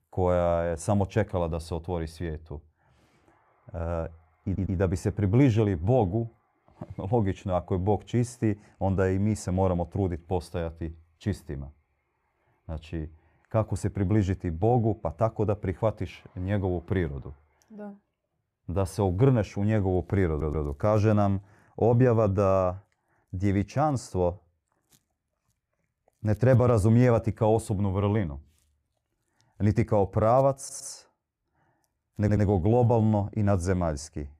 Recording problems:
audio stuttering; 4 times, first at 4.5 s

